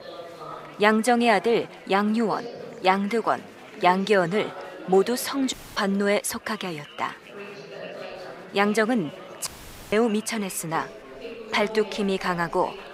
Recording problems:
chatter from many people; noticeable; throughout; 15 dB below the speech
audio cutting out; at 5.5 s and at 9.5 s

